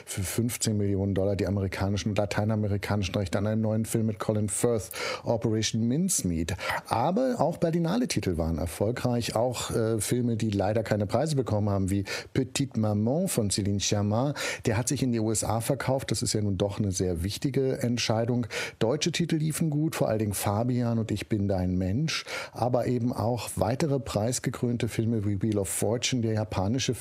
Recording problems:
squashed, flat; heavily

